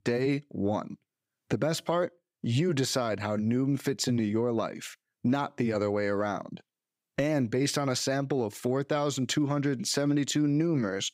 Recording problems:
none

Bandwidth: 15.5 kHz